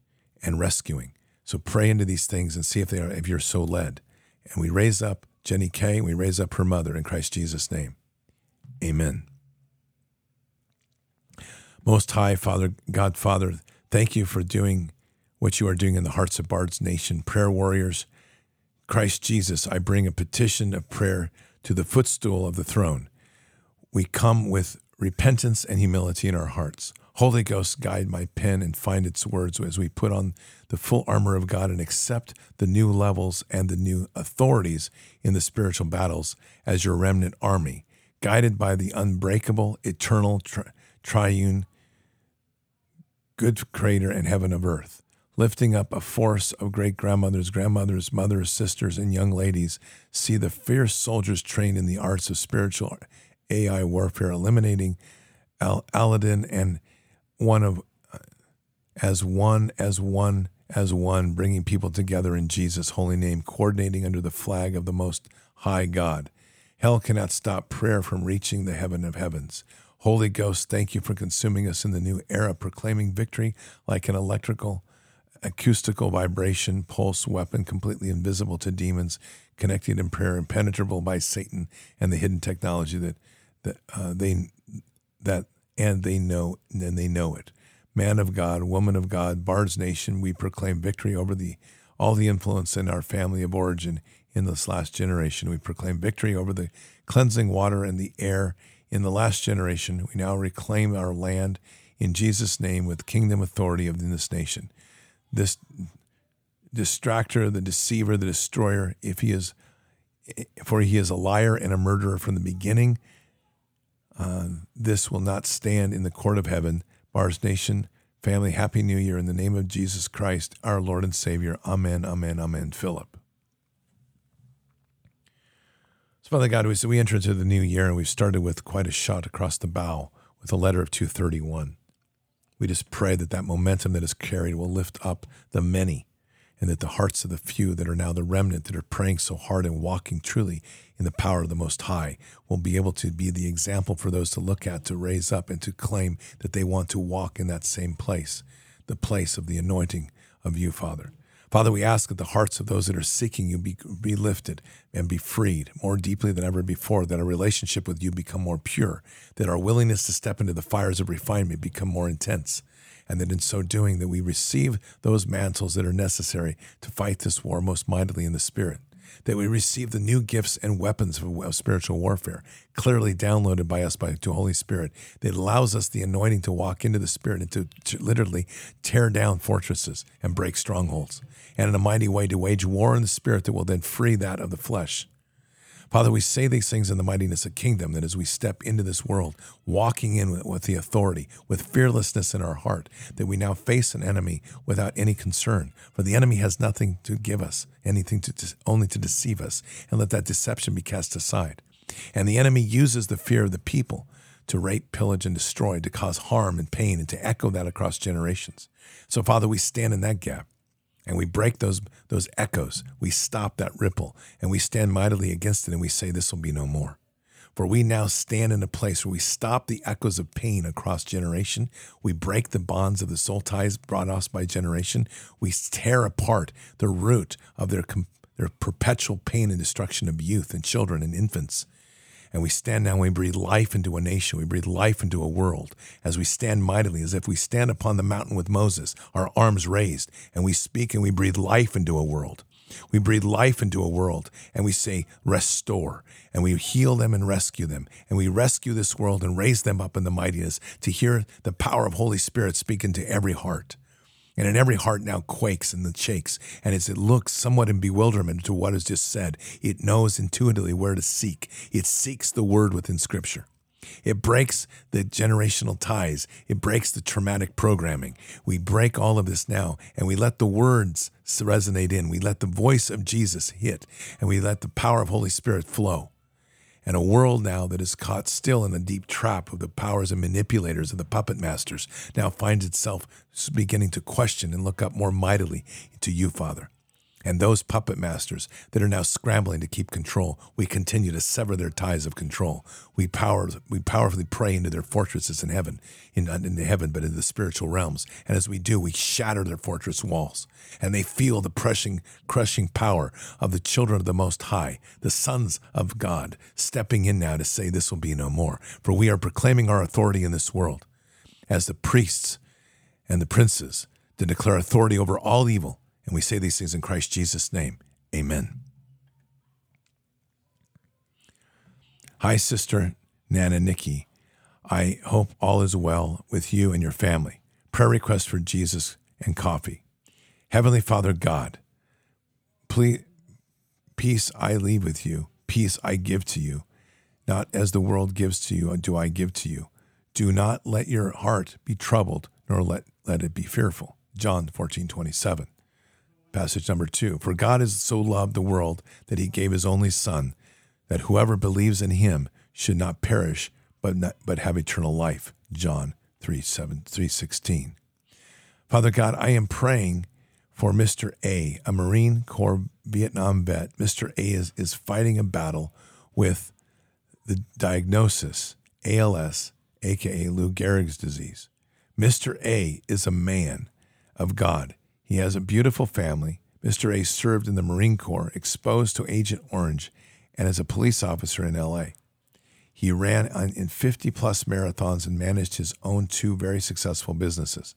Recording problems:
none

